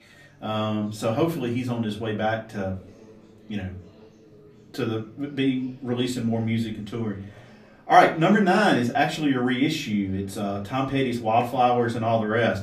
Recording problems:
off-mic speech; far
room echo; very slight; dies away in 0.3 s
chatter from many people; faint; throughout; 25 dB below the speech

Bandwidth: 15 kHz